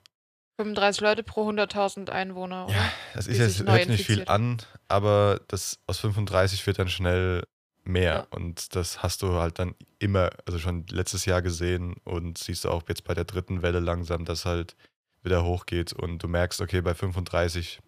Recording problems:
none

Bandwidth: 15 kHz